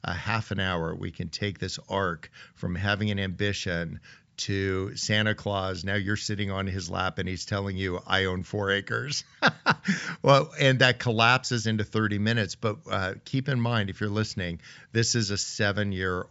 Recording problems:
high frequencies cut off; noticeable; nothing above 8 kHz

